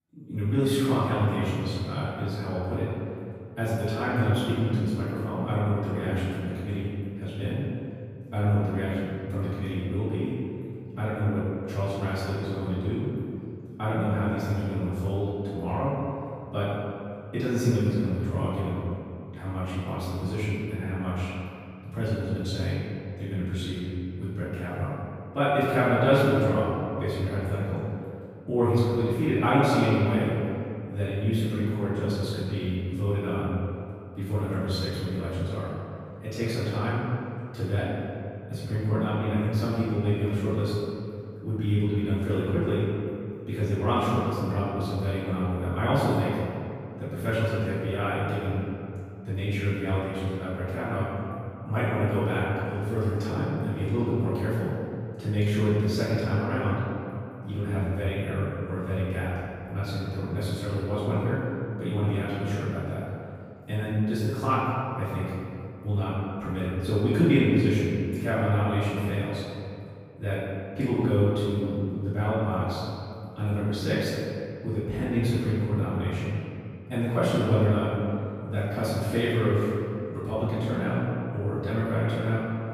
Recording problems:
room echo; strong; dies away in 2.3 s
off-mic speech; far

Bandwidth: 15 kHz